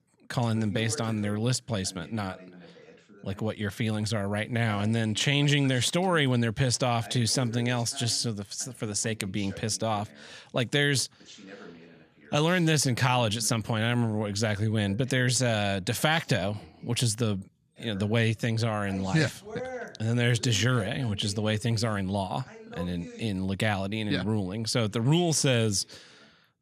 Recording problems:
voice in the background; noticeable; throughout; 20 dB below the speech

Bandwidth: 14.5 kHz